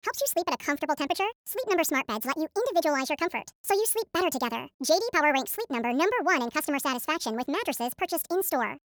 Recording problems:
wrong speed and pitch; too fast and too high; 1.6 times normal speed

